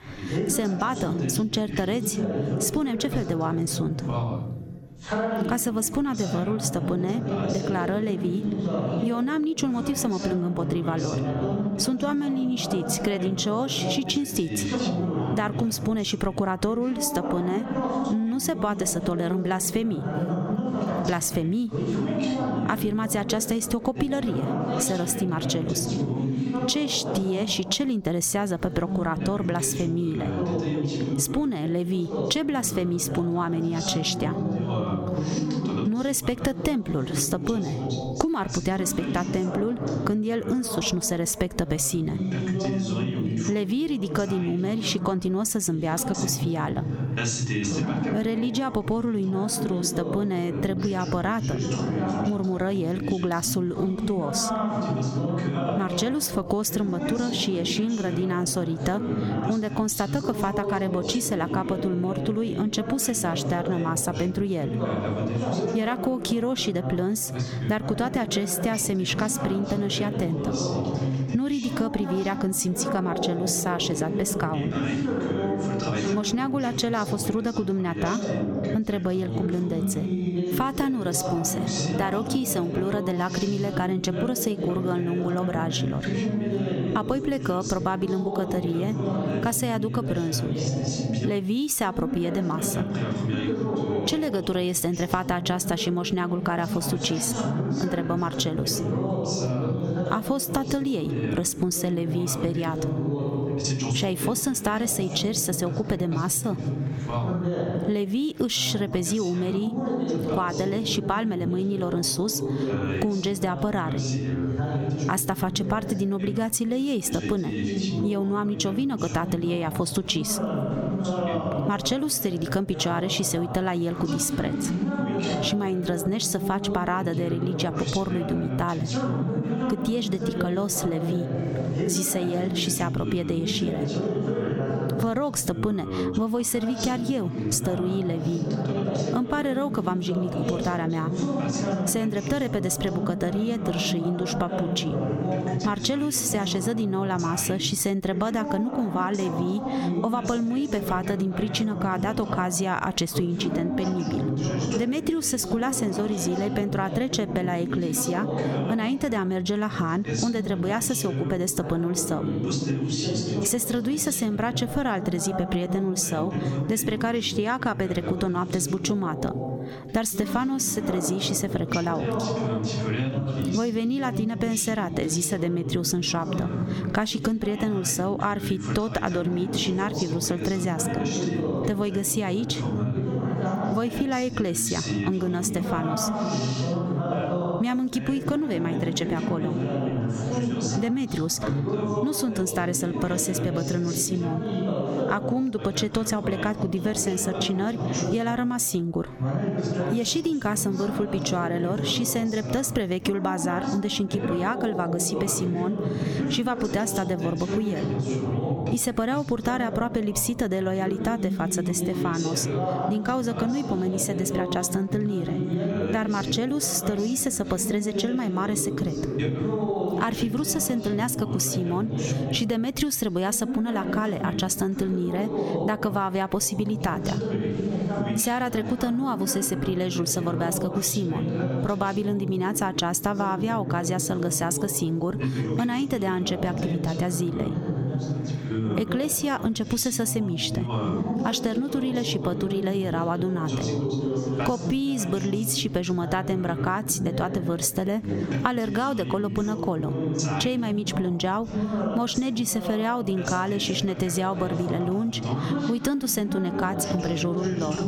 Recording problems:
squashed, flat; somewhat, background pumping
background chatter; loud; throughout; 2 voices, 3 dB below the speech

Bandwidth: 18 kHz